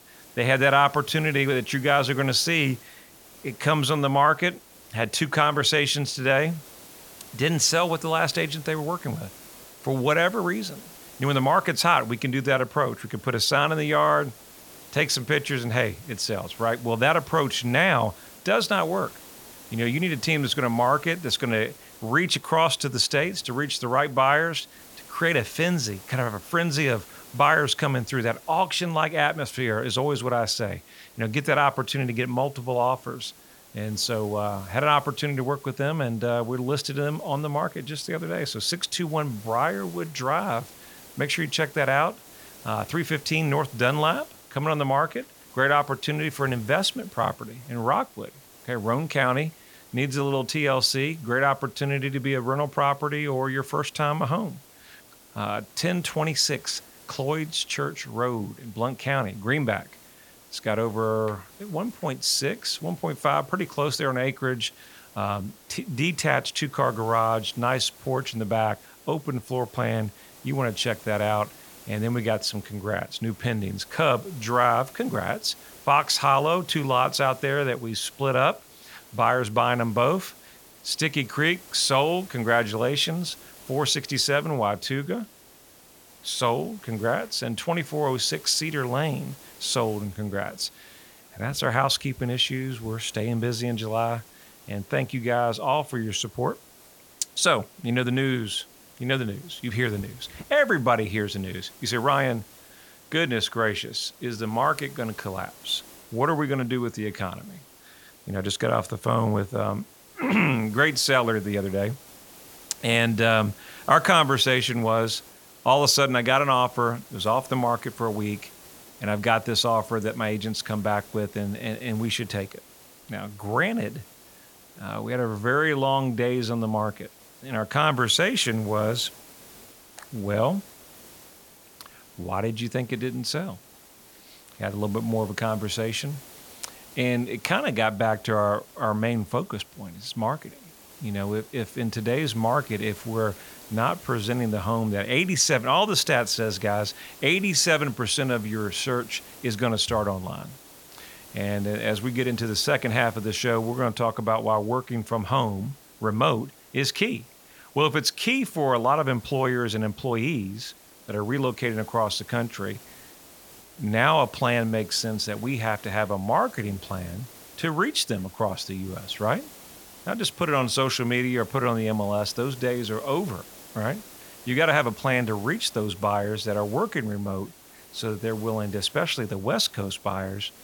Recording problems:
hiss; faint; throughout; 20 dB below the speech

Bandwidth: 17.5 kHz